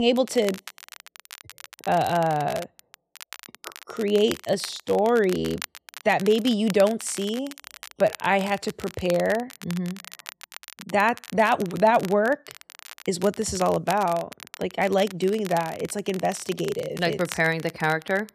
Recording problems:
crackle, like an old record; noticeable; 15 dB below the speech
abrupt cut into speech; at the start

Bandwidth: 14.5 kHz